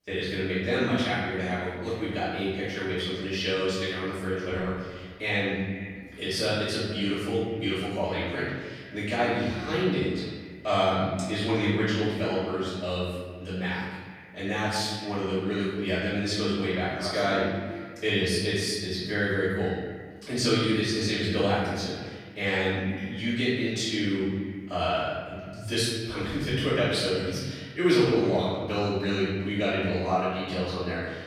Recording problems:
room echo; strong; dies away in 1.3 s
off-mic speech; far
echo of what is said; faint; throughout; 460 ms later, 20 dB below the speech

